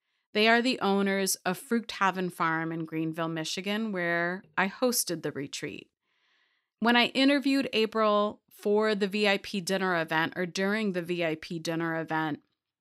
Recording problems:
none

